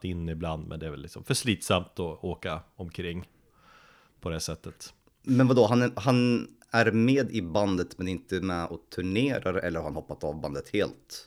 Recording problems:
none

